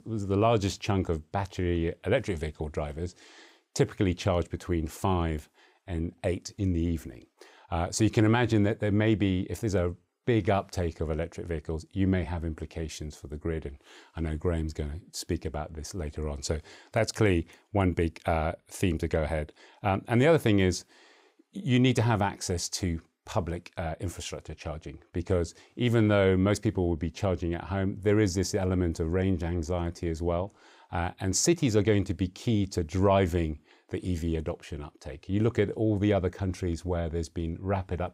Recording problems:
none

